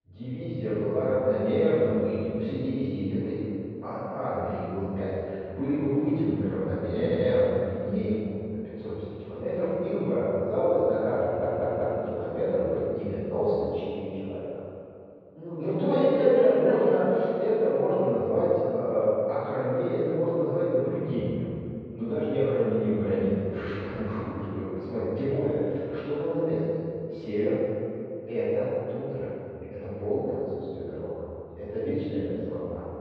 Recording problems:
room echo; strong; dies away in 2.4 s
off-mic speech; far
muffled; very; fading above 4 kHz
audio stuttering; at 7 s and at 11 s

